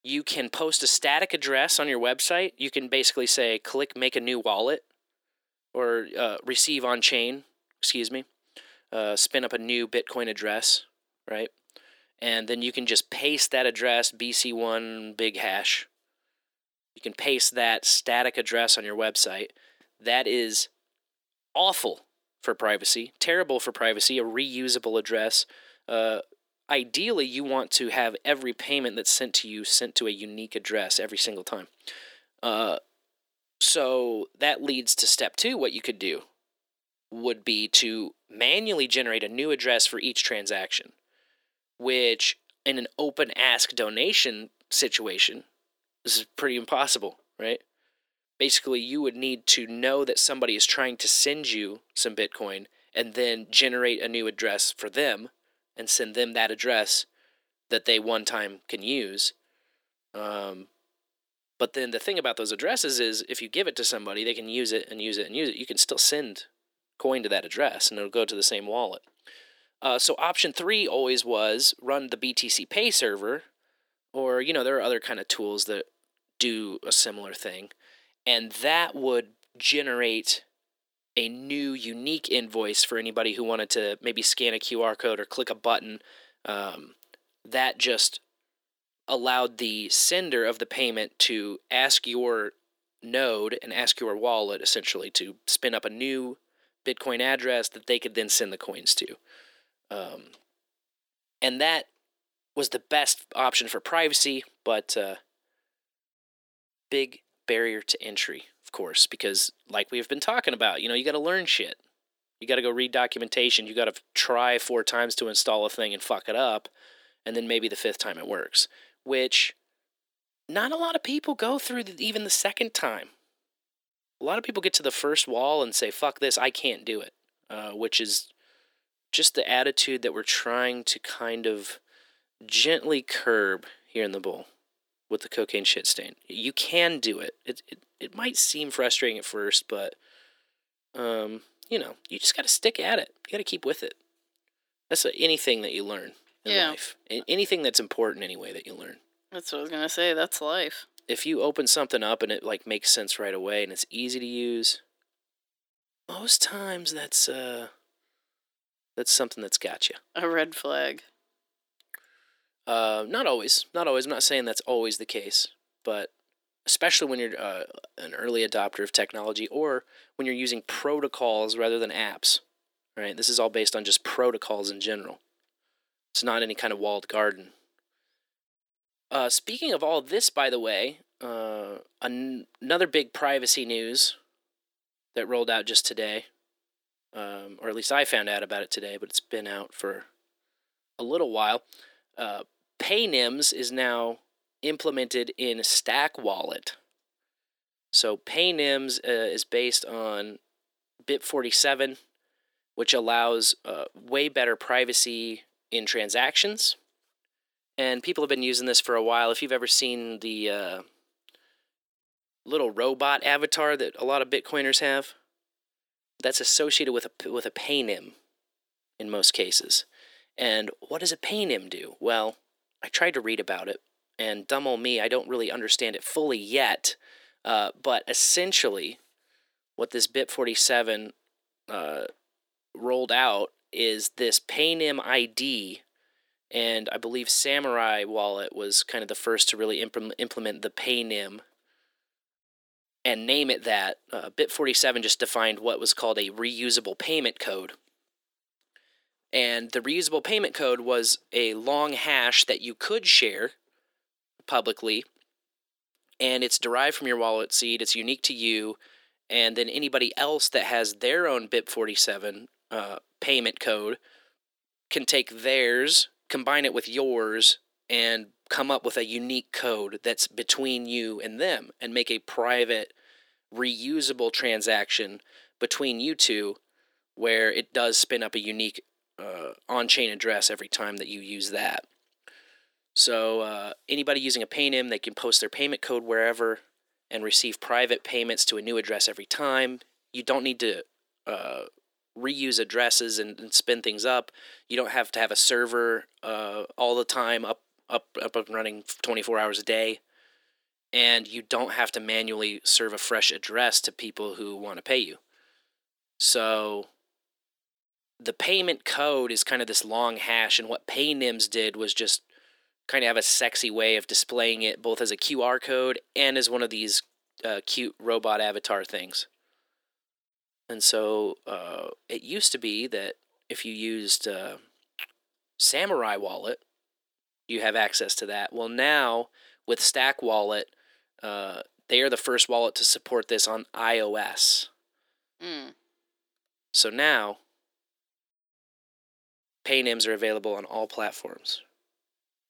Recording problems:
thin; somewhat; fading below 300 Hz

